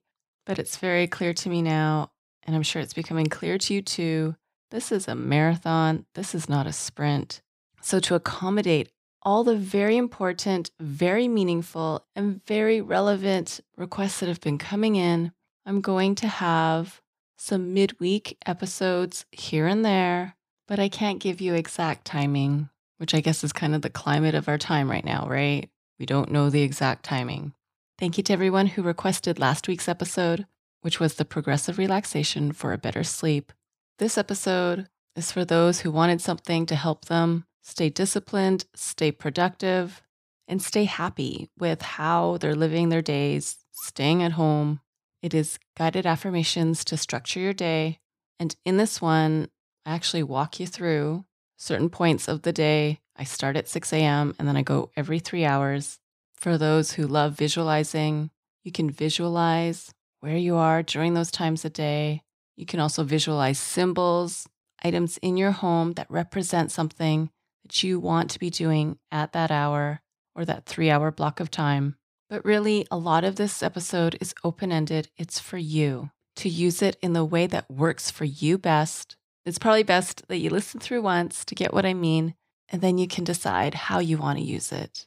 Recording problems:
none

